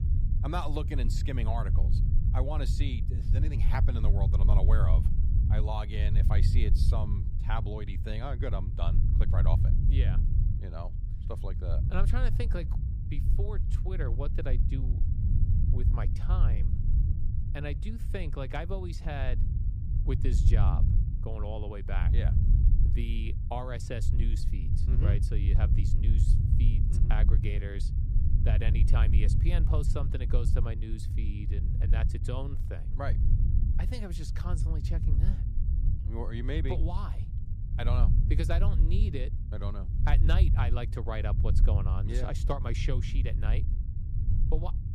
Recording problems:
low rumble; loud; throughout; 5 dB below the speech

